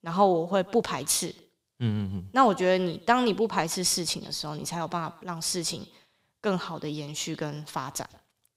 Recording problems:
echo of what is said; faint; throughout; 140 ms later, 20 dB below the speech

